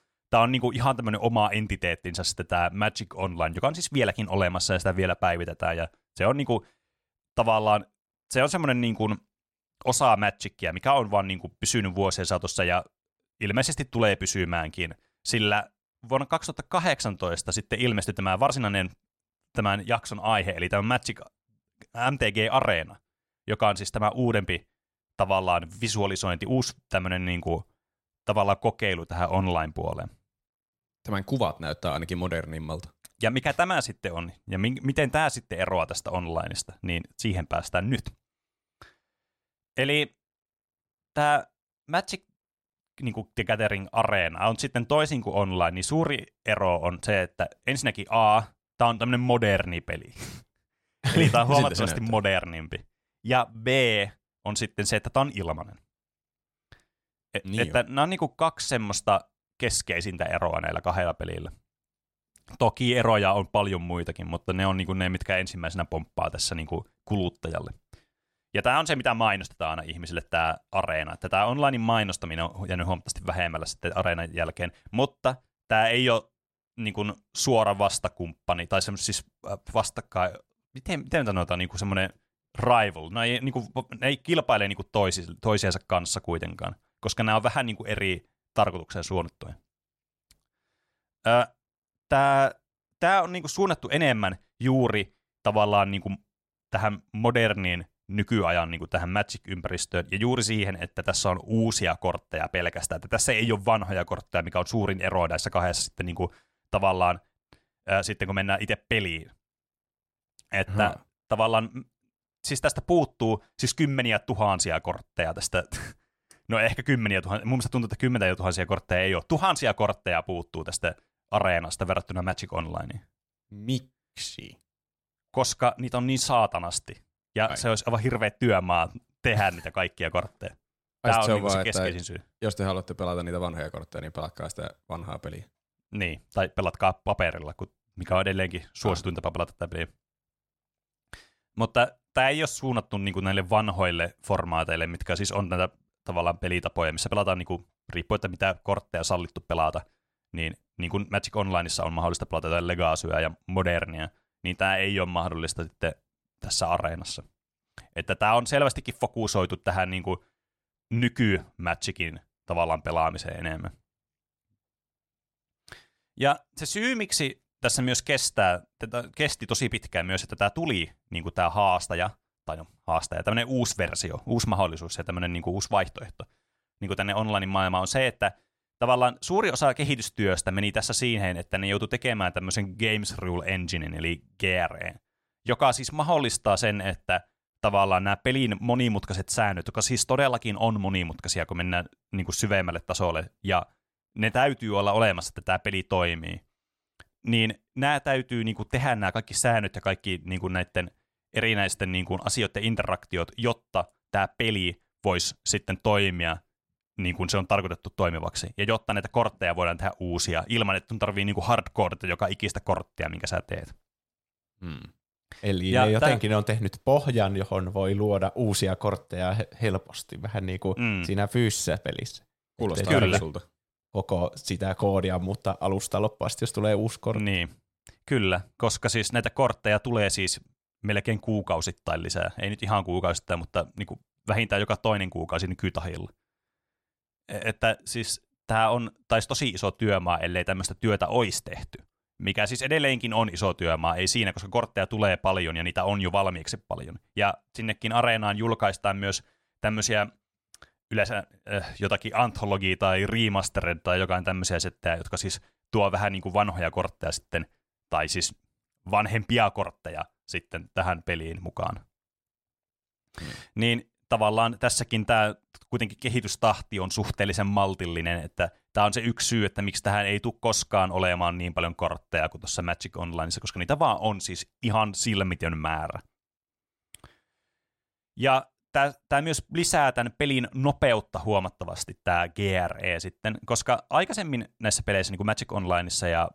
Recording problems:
none

